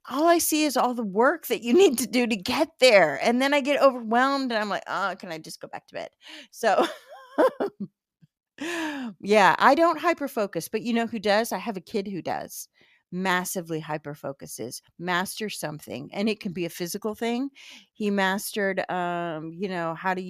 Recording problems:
abrupt cut into speech; at the end

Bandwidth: 14.5 kHz